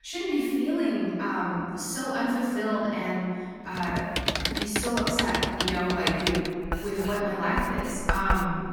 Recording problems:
room echo; strong; dies away in 2.1 s
off-mic speech; far
household noises; loud; from 4 s on; 2 dB below the speech

